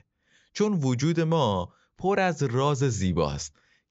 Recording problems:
high frequencies cut off; noticeable; nothing above 7.5 kHz

